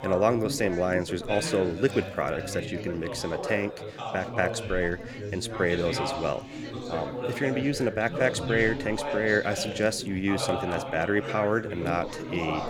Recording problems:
background chatter; loud; throughout; 3 voices, 6 dB below the speech

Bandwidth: 17.5 kHz